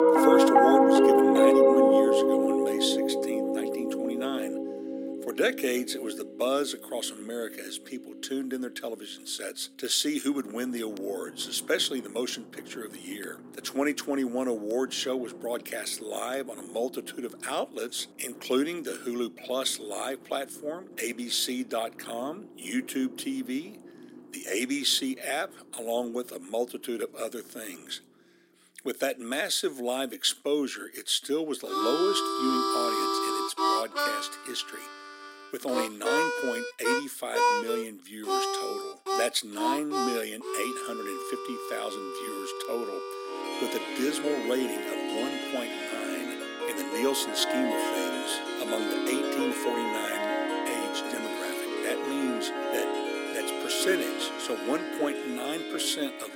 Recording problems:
thin; very slightly; fading below 250 Hz
background music; very loud; throughout; 4 dB above the speech

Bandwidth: 16 kHz